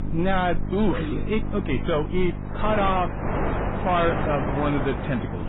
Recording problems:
garbled, watery; badly; nothing above 3.5 kHz
distortion; slight; 10 dB below the speech
wind noise on the microphone; heavy; 5 dB below the speech
electrical hum; noticeable; throughout; 50 Hz, 15 dB below the speech

